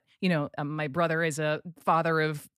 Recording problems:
none

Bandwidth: 14.5 kHz